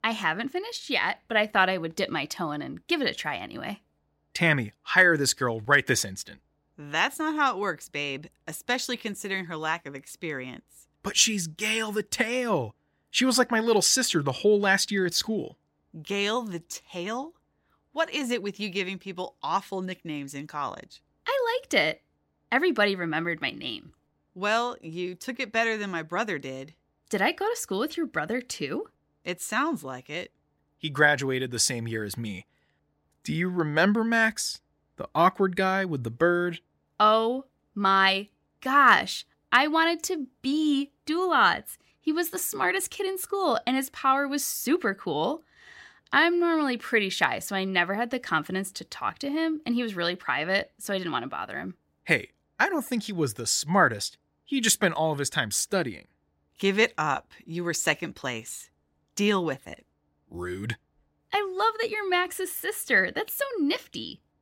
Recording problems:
none

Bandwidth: 16 kHz